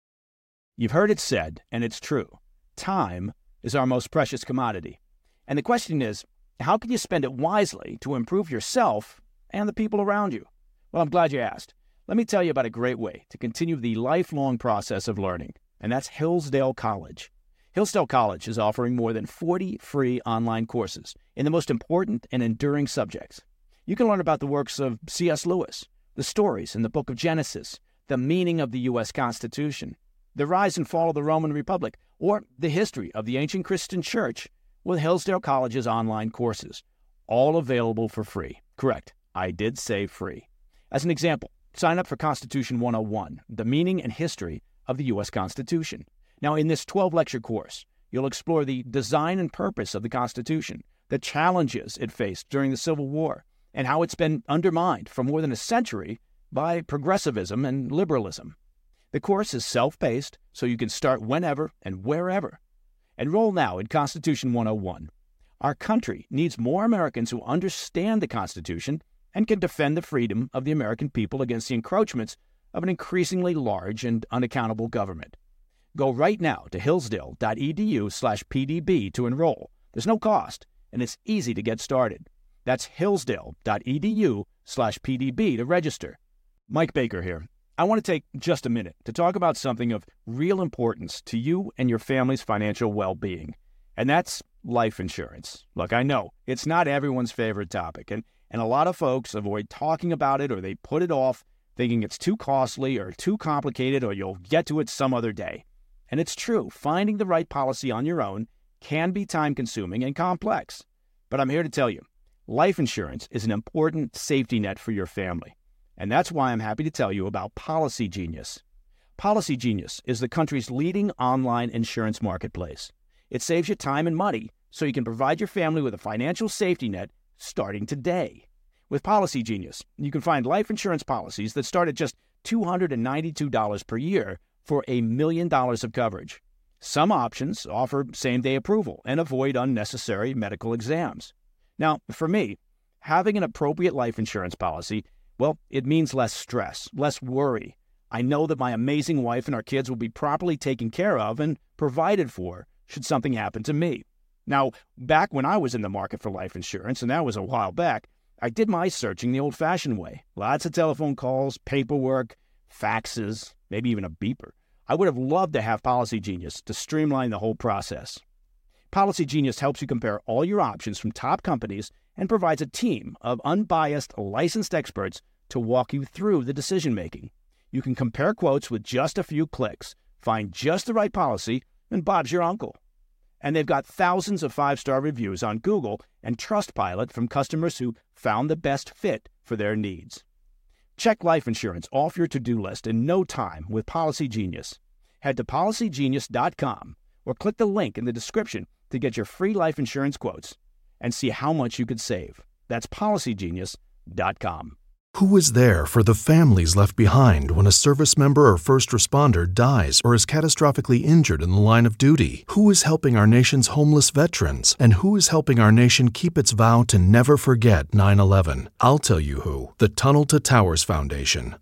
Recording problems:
none

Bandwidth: 16 kHz